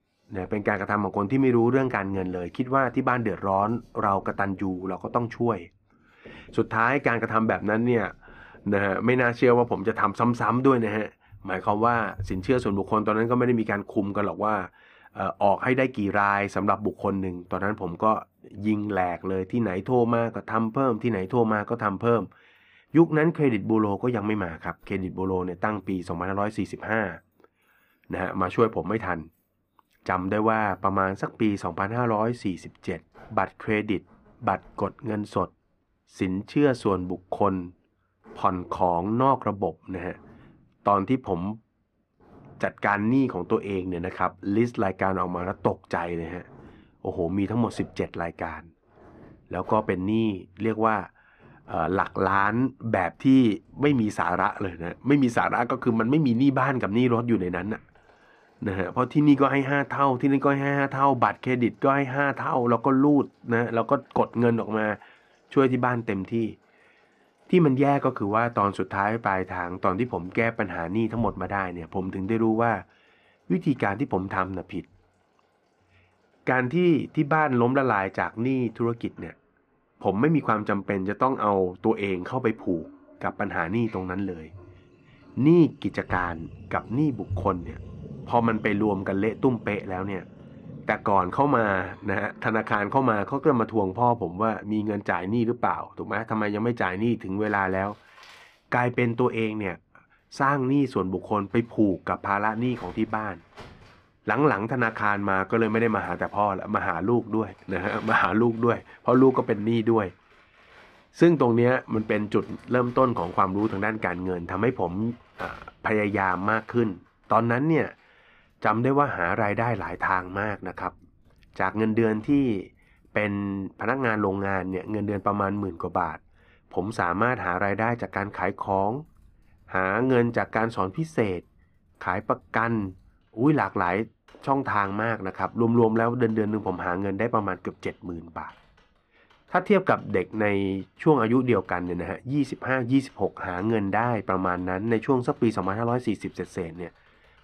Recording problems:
muffled; slightly; fading above 4 kHz
household noises; faint; throughout; 25 dB below the speech

